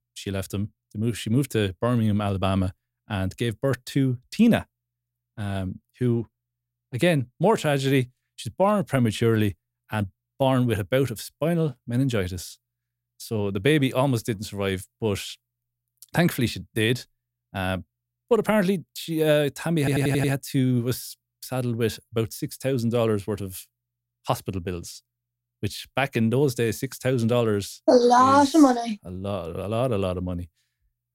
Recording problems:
audio stuttering; at 20 s

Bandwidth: 16 kHz